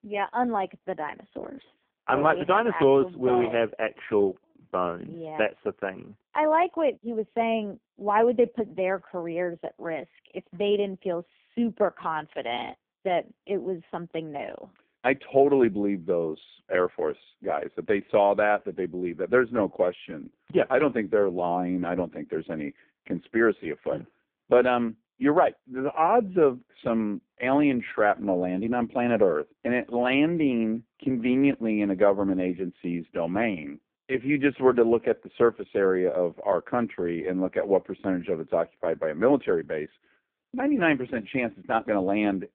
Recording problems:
phone-call audio; poor line

